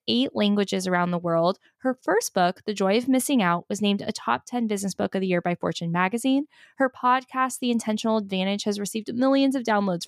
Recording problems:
none

